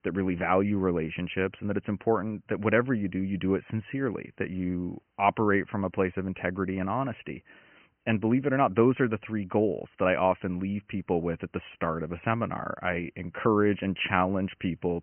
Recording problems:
high frequencies cut off; severe; nothing above 3 kHz

